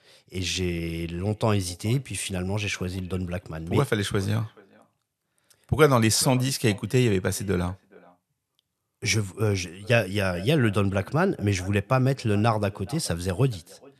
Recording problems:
echo of what is said; faint; throughout; 430 ms later, 25 dB below the speech

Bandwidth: 13.5 kHz